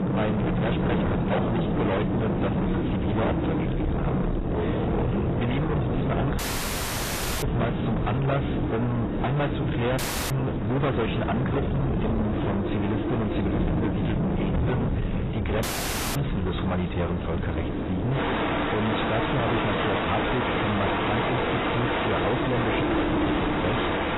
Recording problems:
distortion; heavy; 6 dB below the speech
garbled, watery; badly; nothing above 4 kHz
wind noise on the microphone; heavy; 4 dB below the speech
rain or running water; loud; throughout; as loud as the speech
audio cutting out; at 6.5 s for 1 s, at 10 s and at 16 s for 0.5 s

